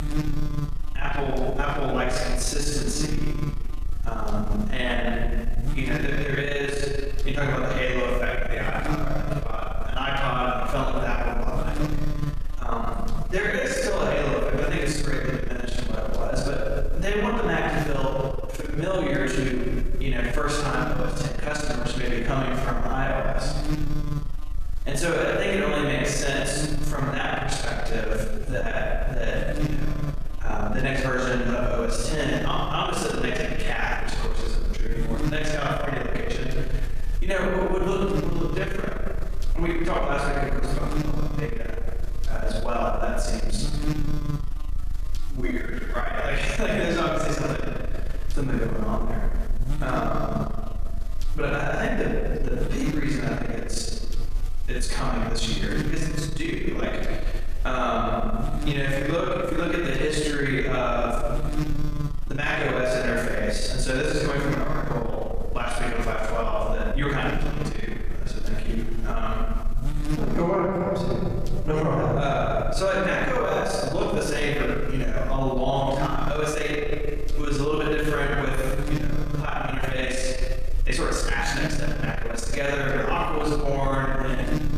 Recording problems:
off-mic speech; far
room echo; noticeable; dies away in 1.4 s
squashed, flat; somewhat
electrical hum; noticeable; throughout; 50 Hz, 15 dB below the speech
uneven, jittery; strongly; from 0.5 s to 1:21

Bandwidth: 14.5 kHz